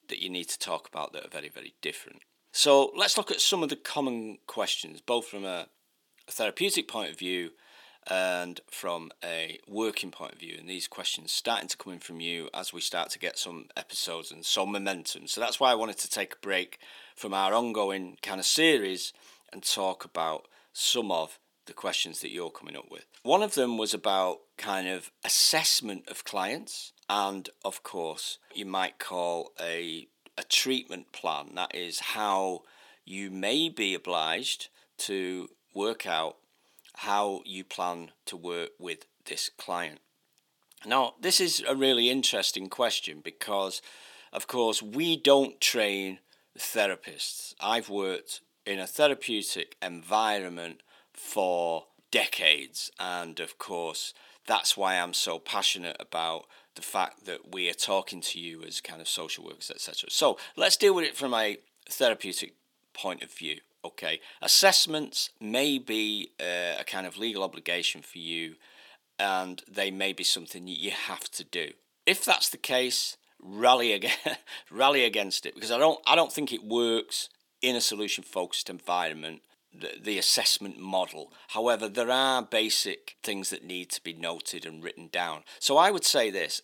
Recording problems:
thin; somewhat; fading below 300 Hz

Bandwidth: 18 kHz